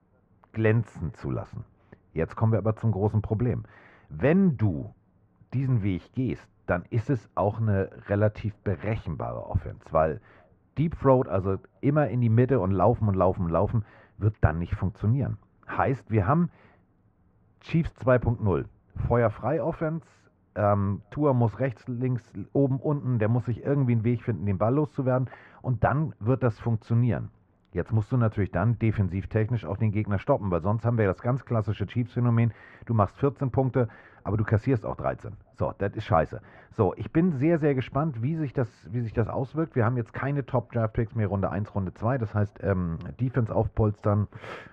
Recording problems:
muffled; very; fading above 1.5 kHz

